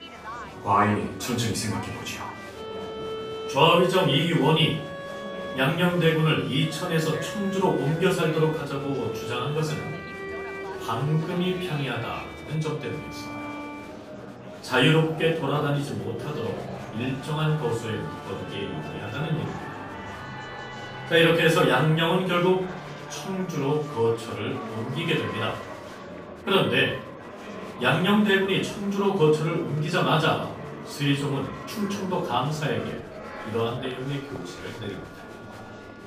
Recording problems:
off-mic speech; far
room echo; noticeable; dies away in 0.4 s
background music; noticeable; throughout; 15 dB below the speech
murmuring crowd; noticeable; throughout; 15 dB below the speech

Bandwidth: 15 kHz